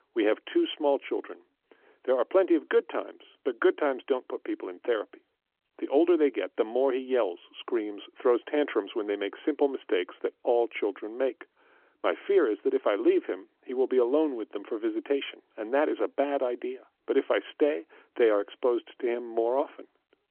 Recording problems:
phone-call audio

